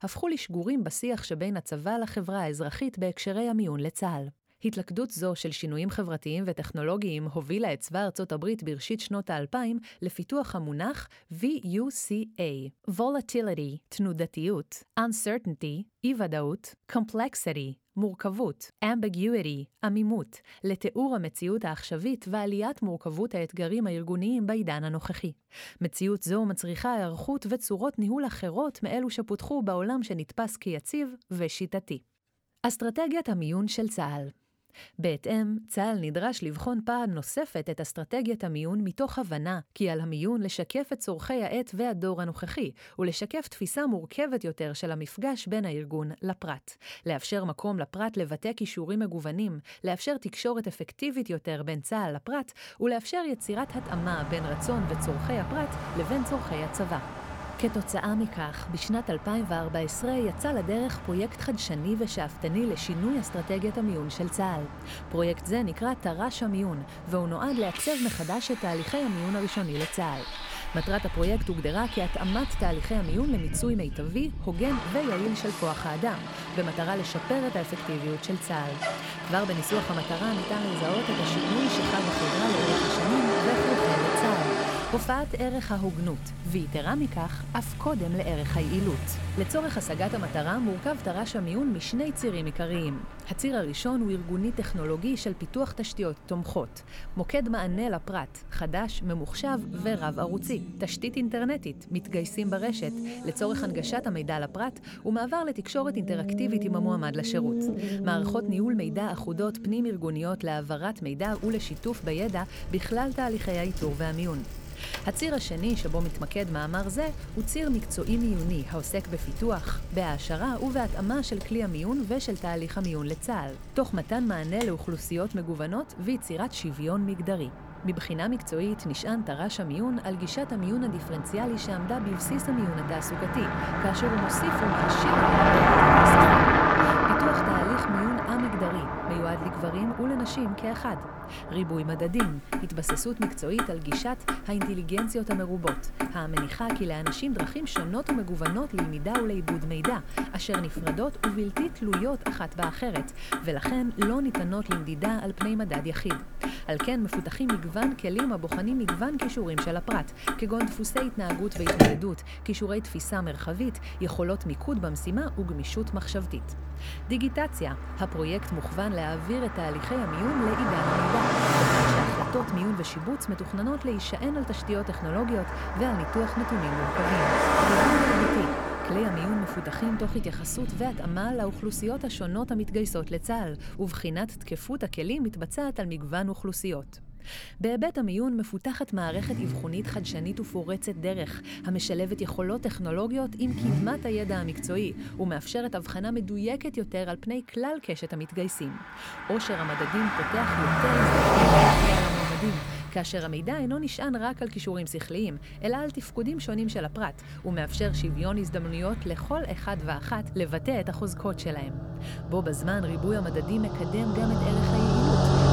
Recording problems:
traffic noise; very loud; from 54 s on; 1 dB above the speech

